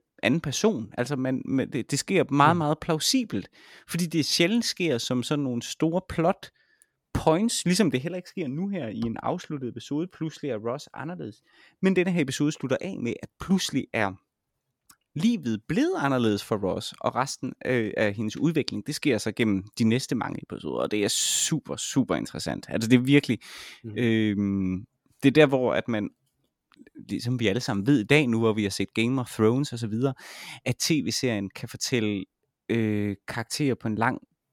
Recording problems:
none

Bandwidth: 17.5 kHz